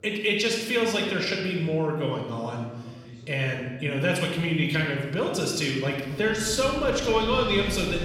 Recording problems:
room echo; noticeable; dies away in 1 s
off-mic speech; somewhat distant
background chatter; faint; throughout; 2 voices, 25 dB below the speech
wind in the background; very faint; from 6 s on; 10 dB below the speech

